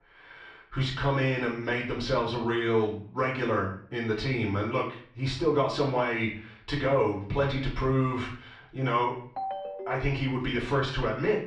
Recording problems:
off-mic speech; far
muffled; slightly; fading above 4 kHz
room echo; slight; dies away in 0.5 s
phone ringing; noticeable; at 9.5 s; peak 6 dB below the speech

